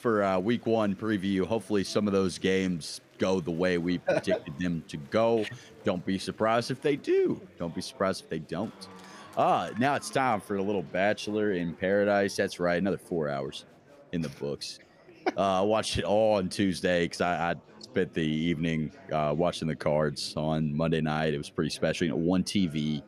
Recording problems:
chatter from many people; faint; throughout; 25 dB below the speech

